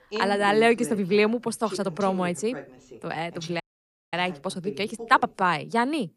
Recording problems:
voice in the background; noticeable; throughout; 15 dB below the speech
uneven, jittery; strongly; from 1 to 5.5 s
audio cutting out; at 3.5 s for 0.5 s

